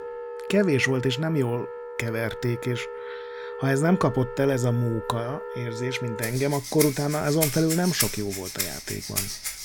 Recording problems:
background music; loud; throughout; 6 dB below the speech

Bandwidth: 17.5 kHz